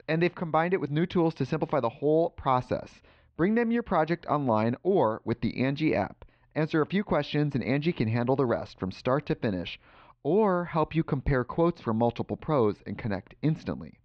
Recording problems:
muffled; slightly; fading above 3.5 kHz

